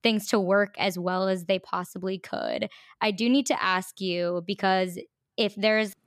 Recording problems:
none

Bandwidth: 14.5 kHz